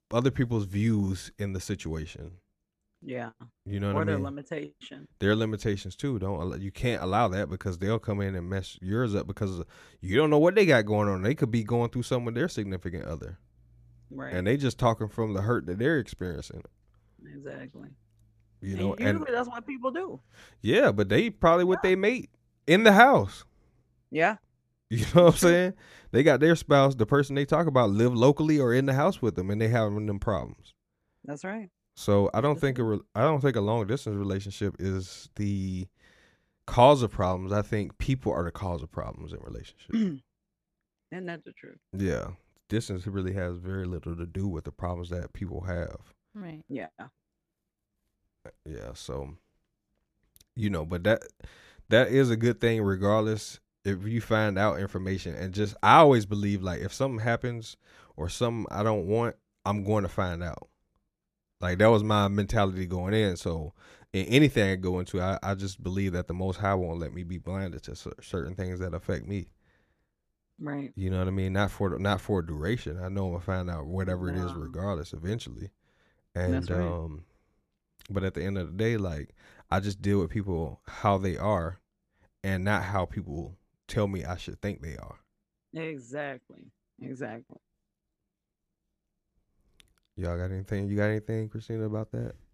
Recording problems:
none

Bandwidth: 14.5 kHz